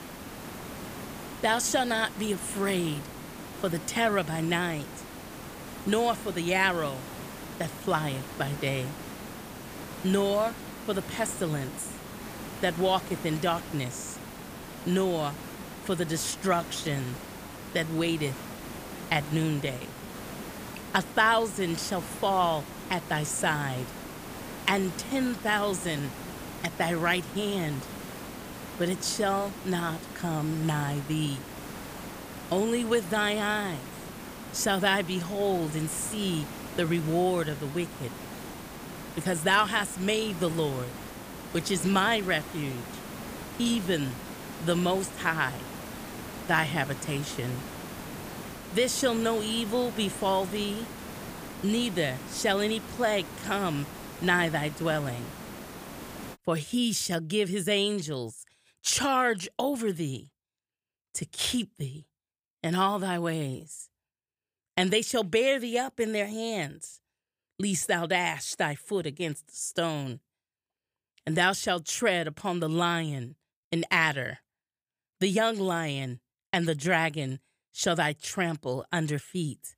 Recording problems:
hiss; noticeable; until 56 s; 10 dB below the speech

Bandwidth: 15 kHz